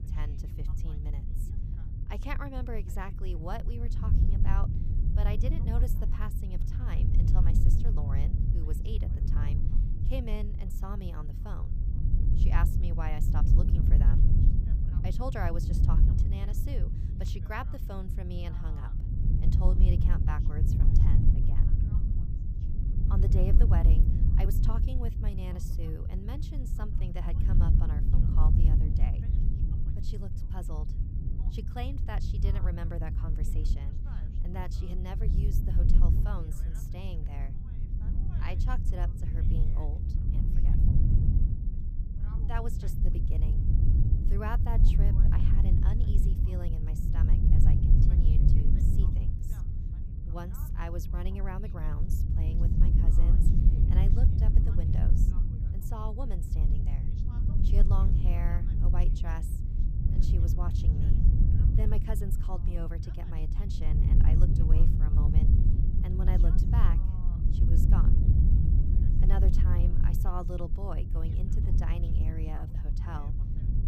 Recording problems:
low rumble; loud; throughout; as loud as the speech
voice in the background; faint; throughout; 20 dB below the speech

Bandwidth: 15 kHz